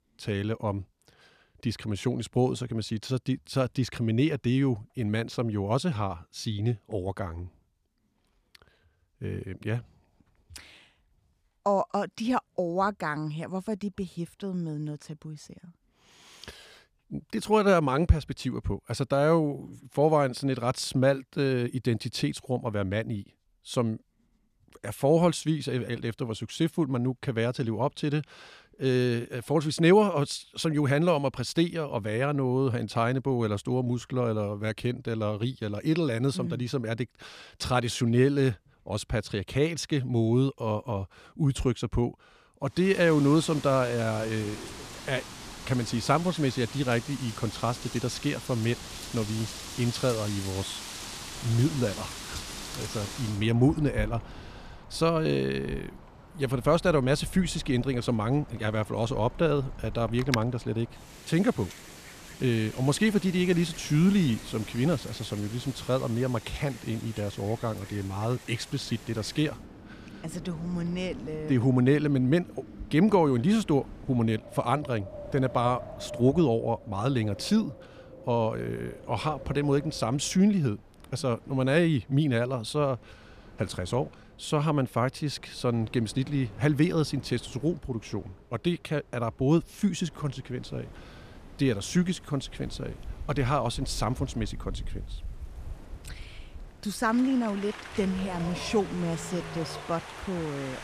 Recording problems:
wind in the background; noticeable; from 43 s on; 15 dB below the speech

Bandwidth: 14.5 kHz